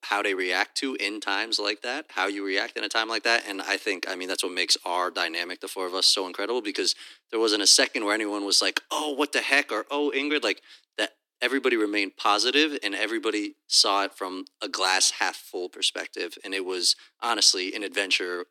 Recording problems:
thin; somewhat; fading below 300 Hz

